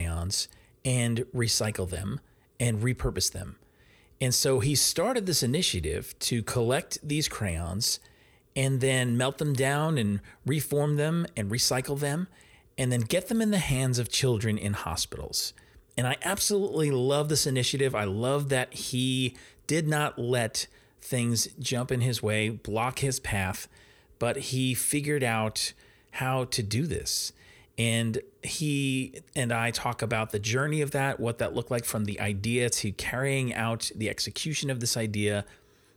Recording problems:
abrupt cut into speech; at the start

